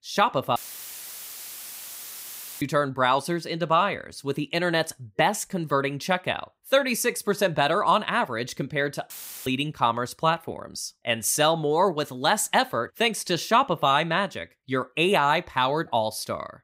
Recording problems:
audio cutting out; filled with static; at 0.5 s for 2 s and at 9 s

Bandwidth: 15.5 kHz